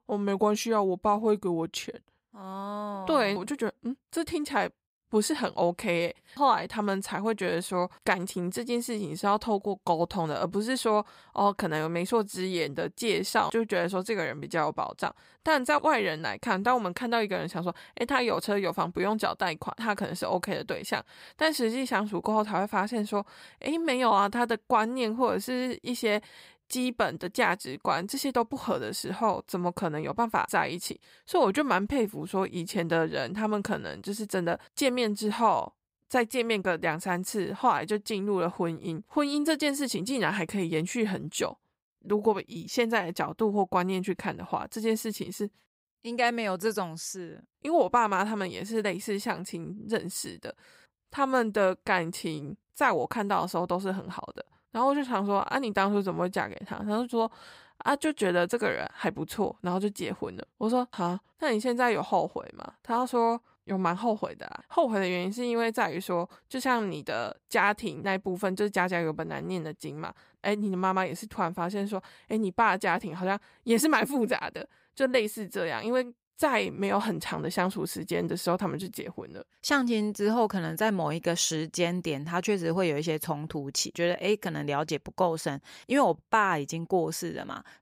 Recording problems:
none

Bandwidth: 15.5 kHz